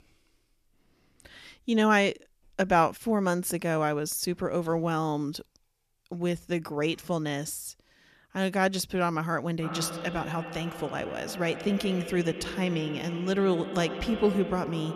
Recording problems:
echo of what is said; strong; from 9.5 s on; 110 ms later, 10 dB below the speech

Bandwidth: 14.5 kHz